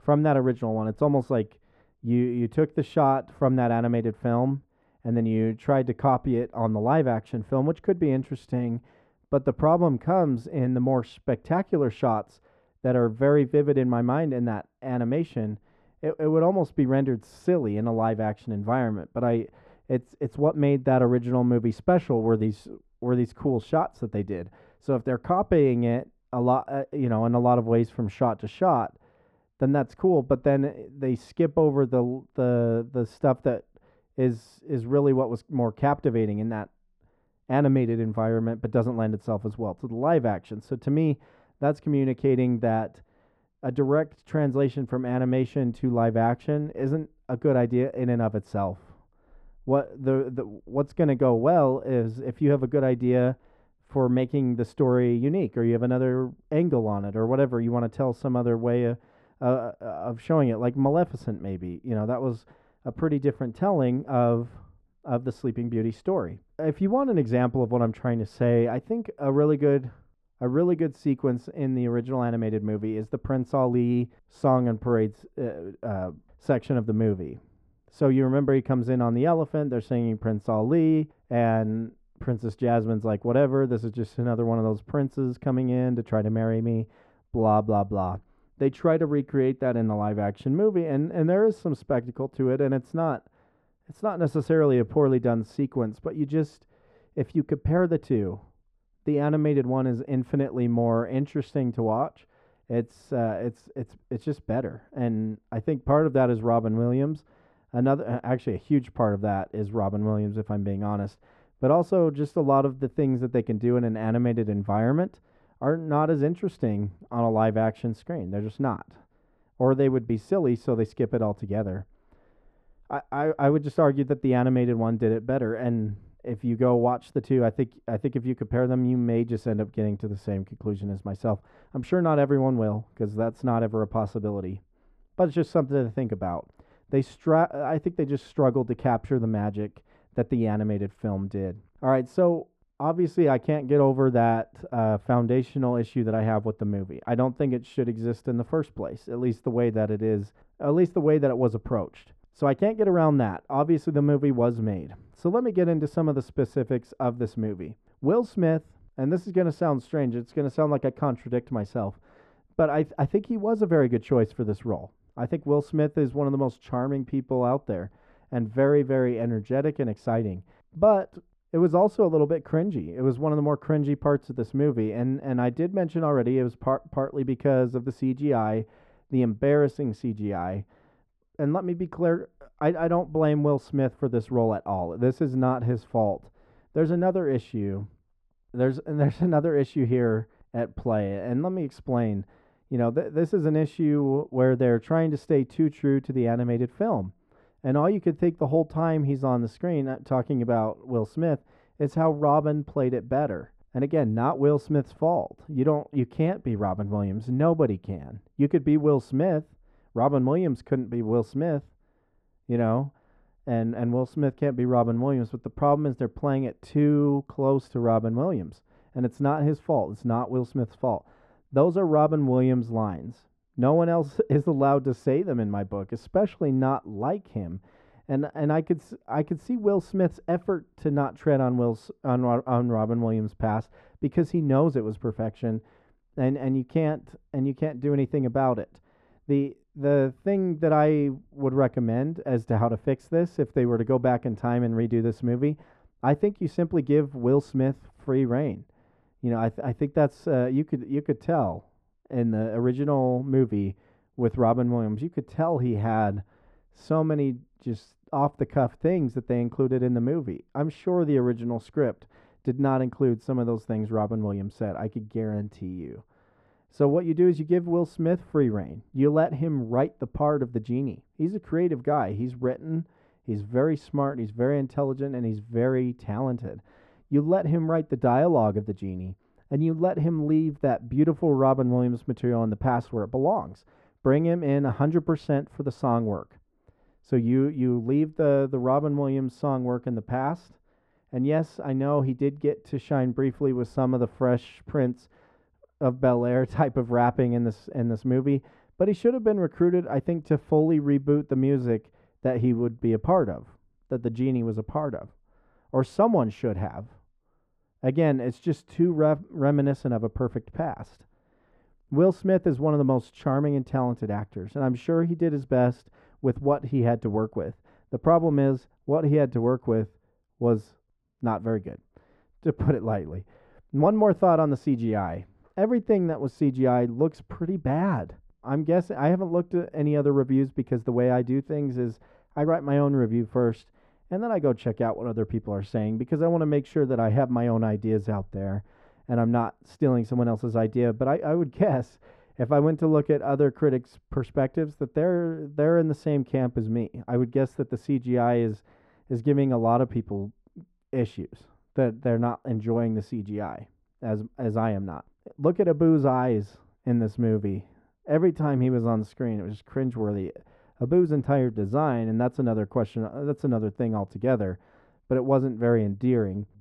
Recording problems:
muffled; very; fading above 2.5 kHz

